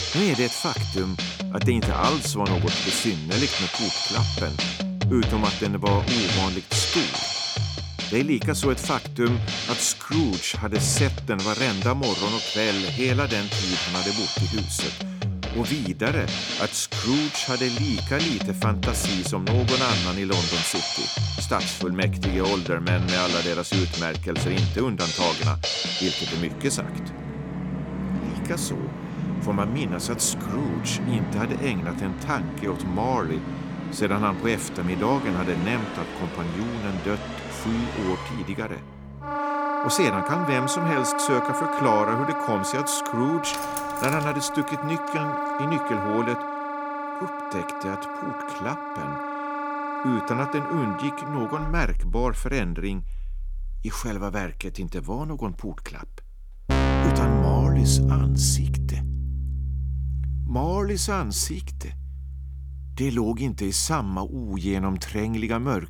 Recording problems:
background music; loud; throughout; as loud as the speech

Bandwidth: 17.5 kHz